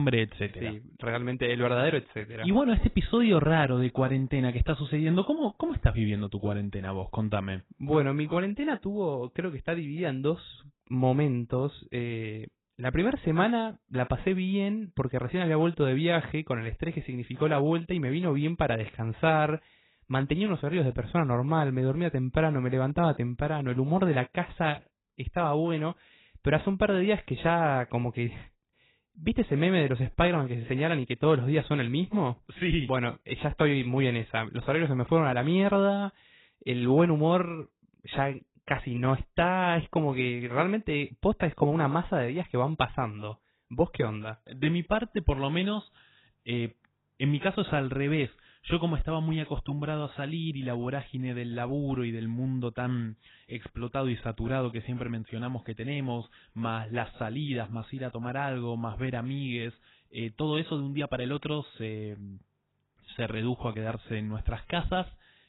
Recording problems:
garbled, watery; badly; nothing above 4 kHz
abrupt cut into speech; at the start

